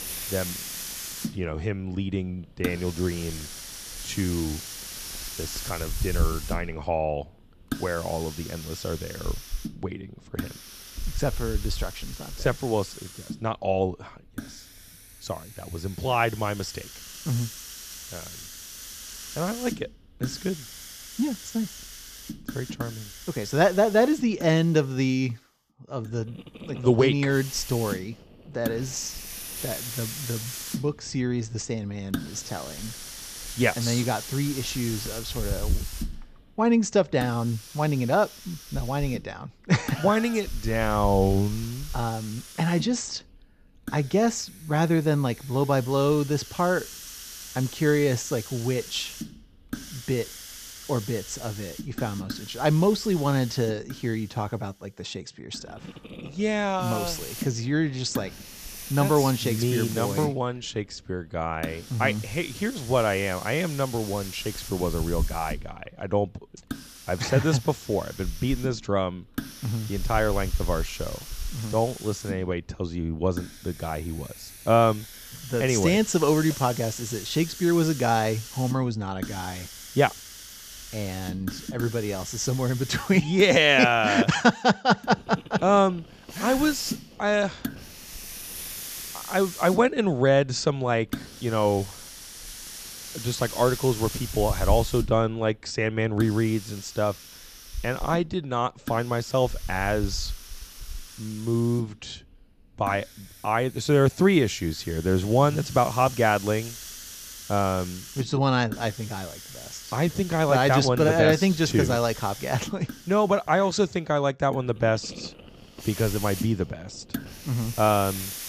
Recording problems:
high frequencies cut off; noticeable; nothing above 8 kHz
hiss; noticeable; throughout; 10 dB below the speech

